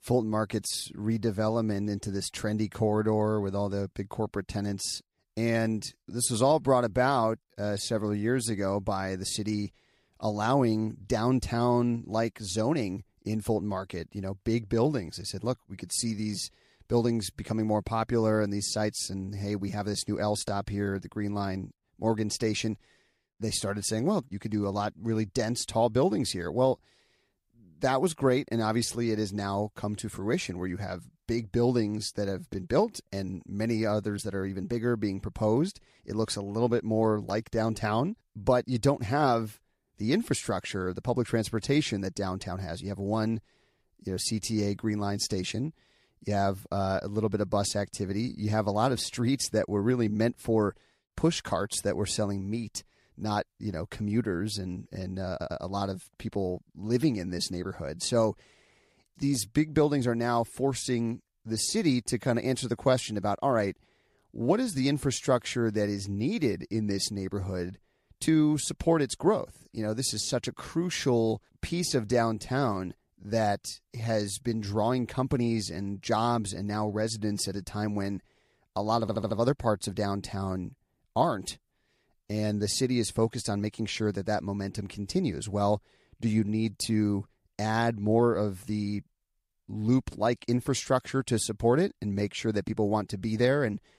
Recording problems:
audio stuttering; at 55 s and at 1:19

